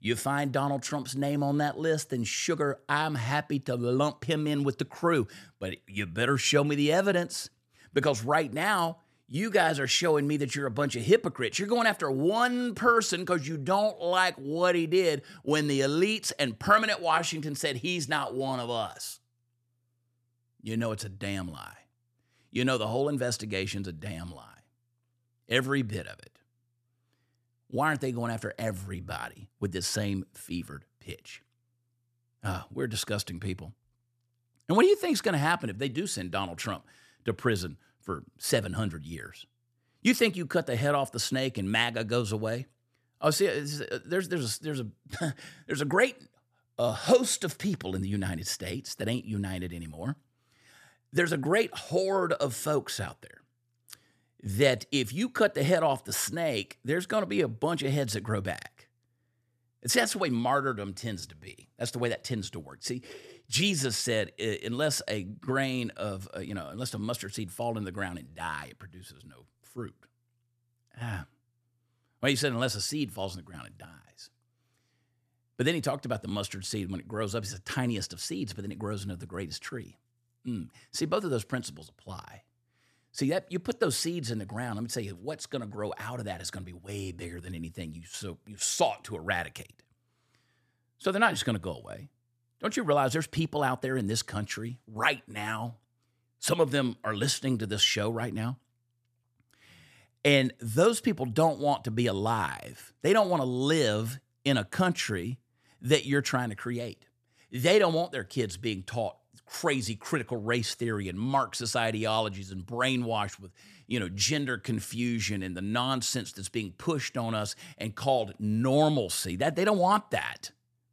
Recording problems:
none

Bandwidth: 14.5 kHz